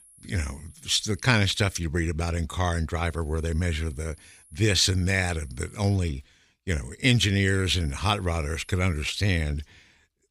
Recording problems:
high-pitched whine; faint; until 1.5 s, from 3 to 6 s and from 7.5 to 9.5 s; 11 kHz, 30 dB below the speech

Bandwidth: 15 kHz